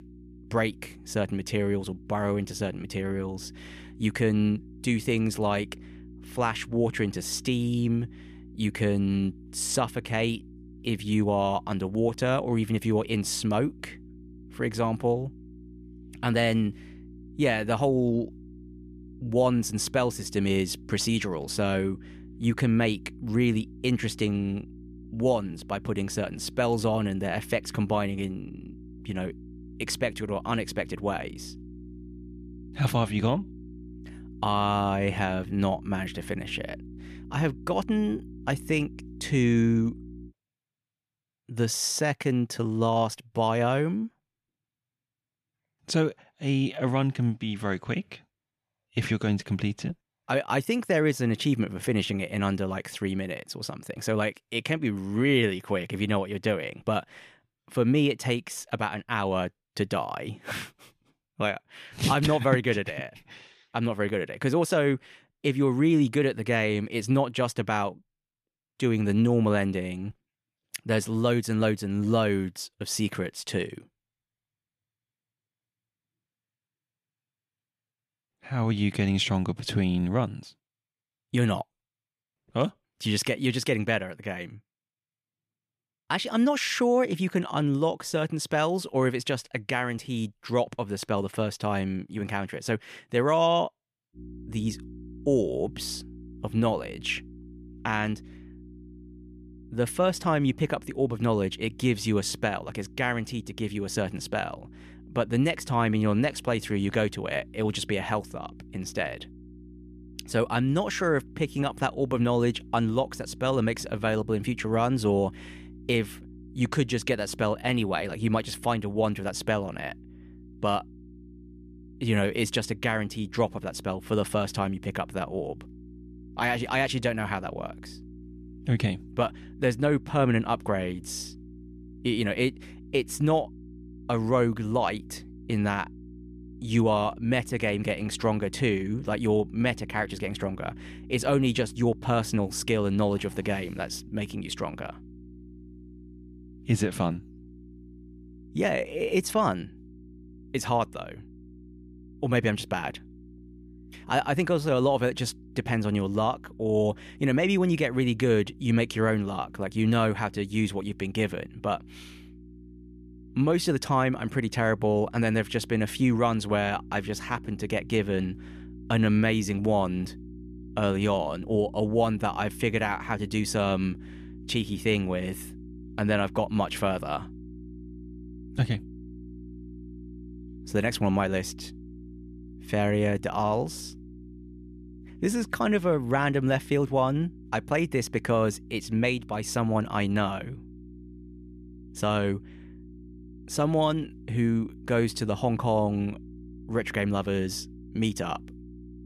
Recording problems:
electrical hum; faint; until 40 s and from 1:34 on; 60 Hz, 25 dB below the speech

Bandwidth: 14.5 kHz